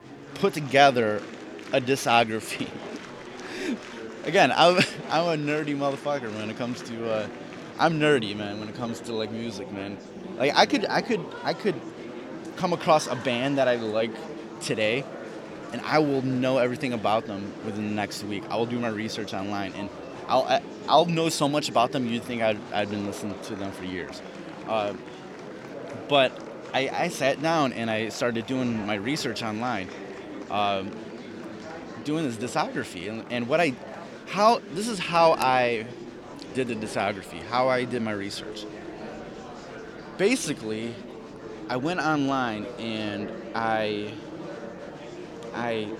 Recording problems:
murmuring crowd; noticeable; throughout; 15 dB below the speech

